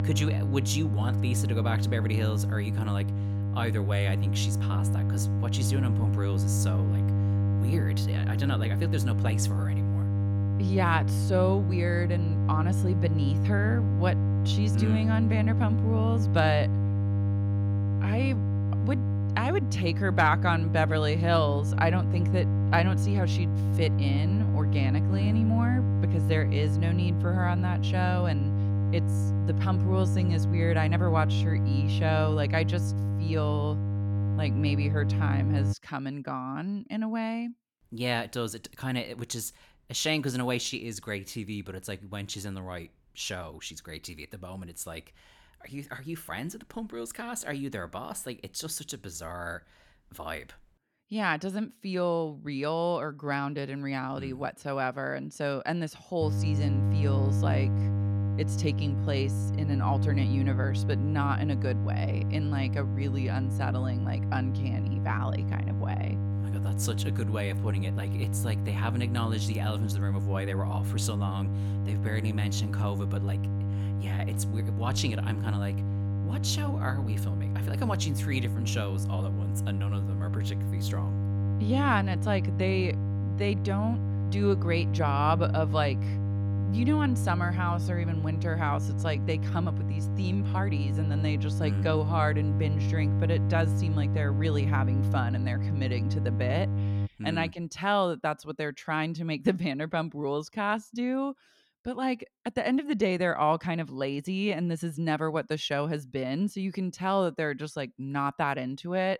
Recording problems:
electrical hum; loud; until 36 s and from 56 s to 1:37; 50 Hz, 7 dB below the speech

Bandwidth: 17 kHz